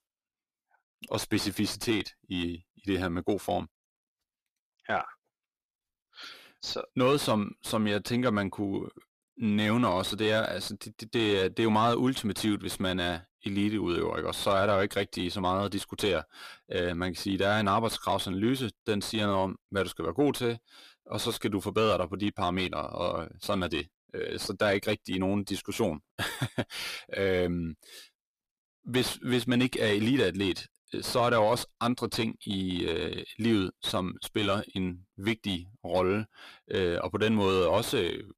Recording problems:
distortion; slight; 10 dB below the speech

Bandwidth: 14.5 kHz